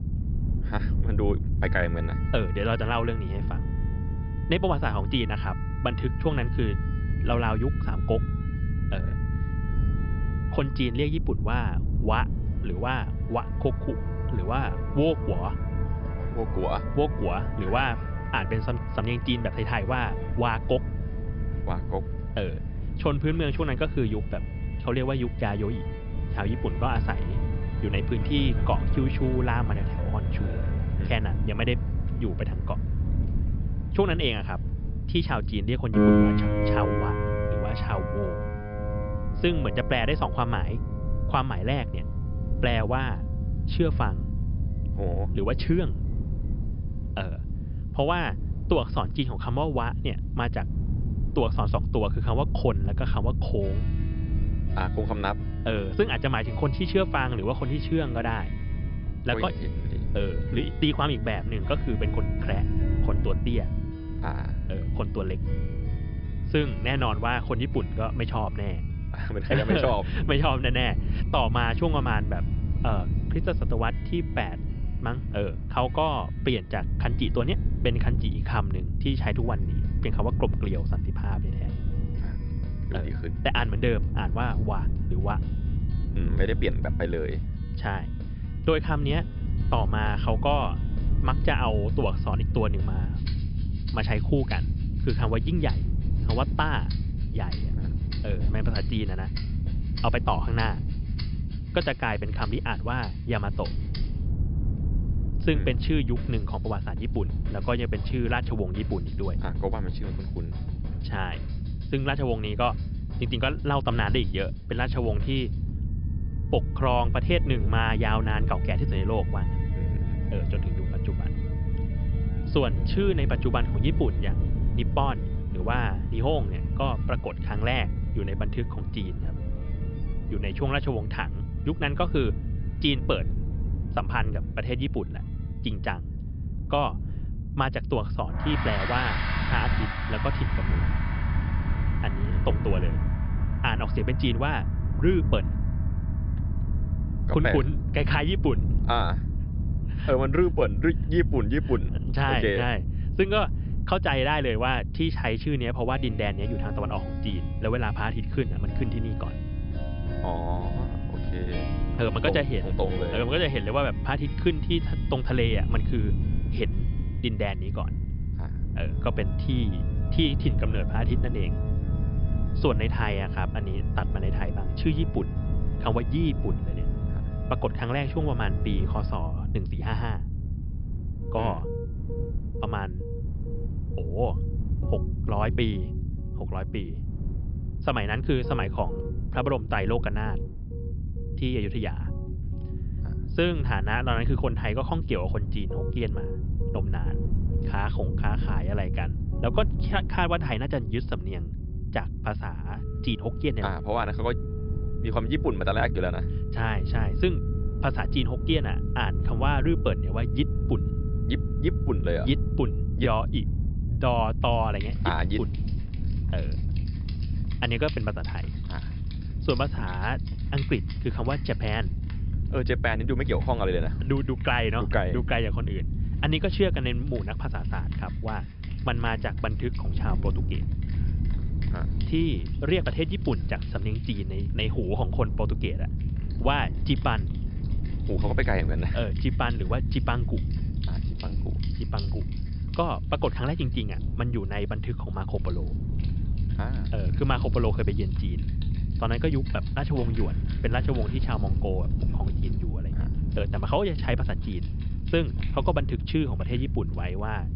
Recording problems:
high frequencies cut off; noticeable; nothing above 5.5 kHz
background music; noticeable; throughout; 10 dB below the speech
low rumble; noticeable; throughout; 15 dB below the speech

